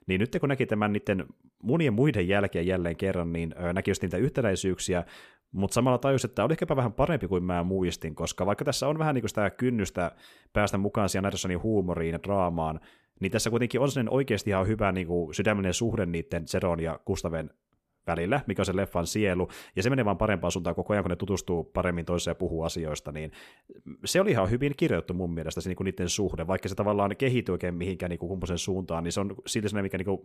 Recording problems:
none

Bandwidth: 14.5 kHz